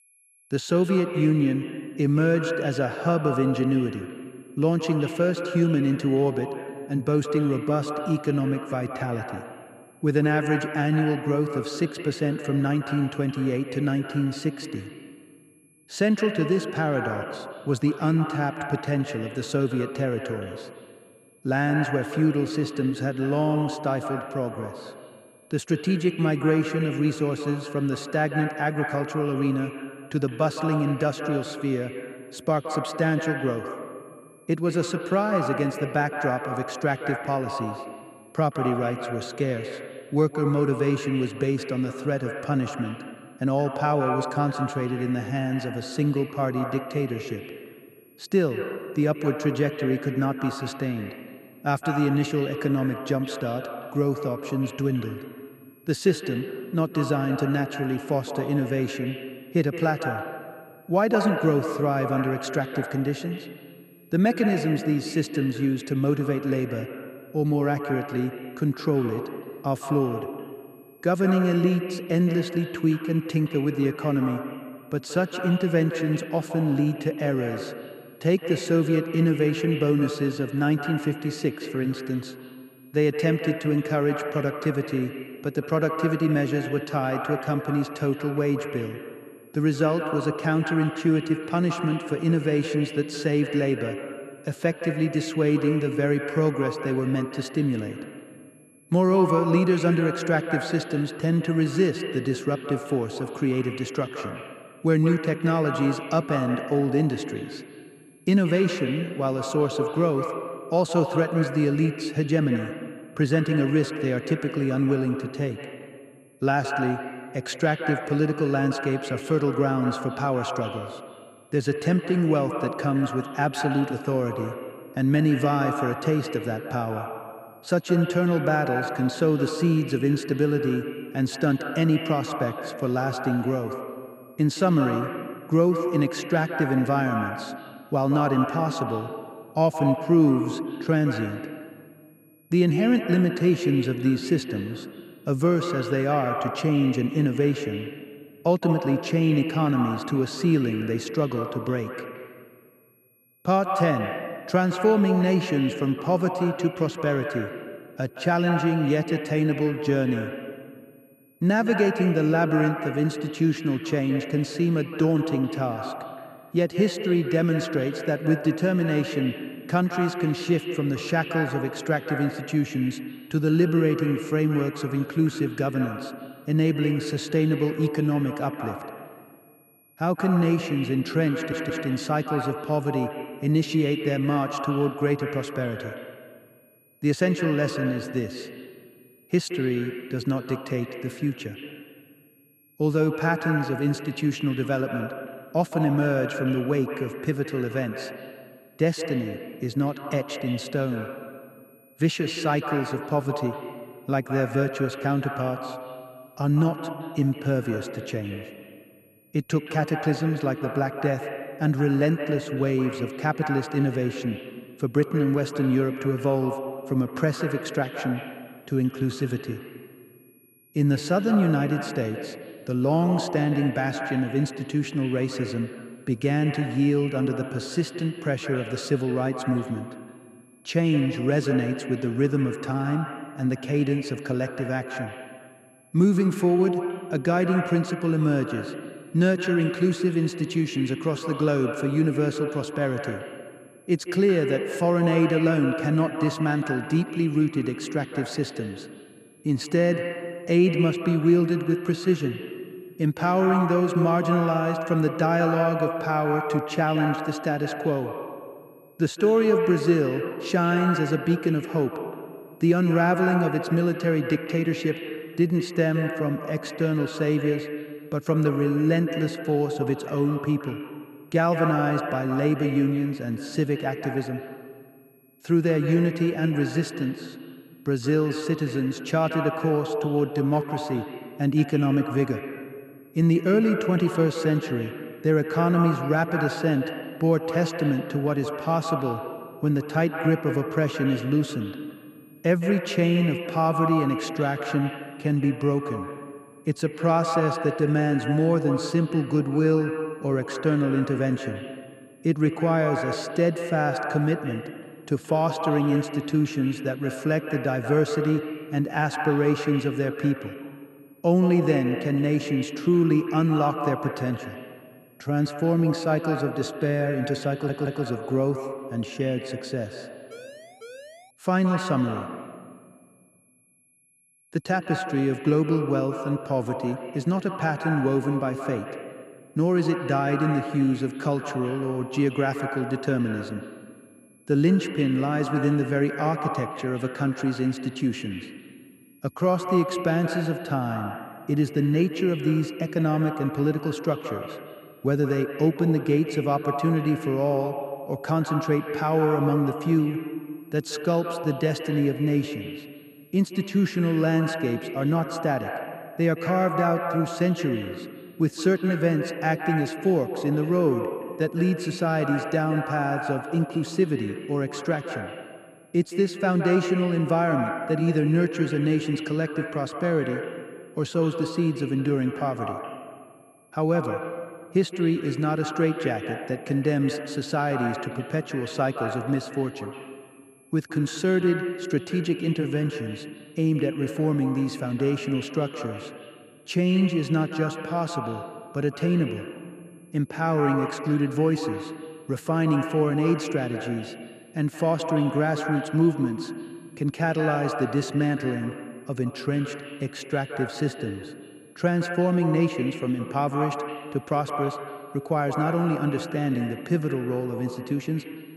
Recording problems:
echo of what is said; strong; throughout; 170 ms later, 8 dB below the speech
high-pitched whine; faint; throughout; 11 kHz, 35 dB below the speech
audio stuttering; at 3:01 and at 5:18
siren; faint; from 5:20 to 5:21; peak 20 dB below the speech

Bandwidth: 14.5 kHz